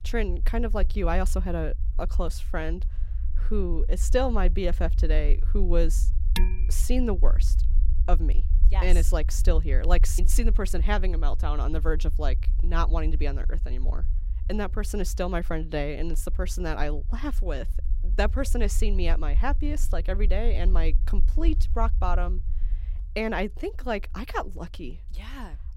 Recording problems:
low rumble; noticeable; throughout; 20 dB below the speech
clattering dishes; noticeable; at 6.5 s; peak 2 dB below the speech

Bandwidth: 16 kHz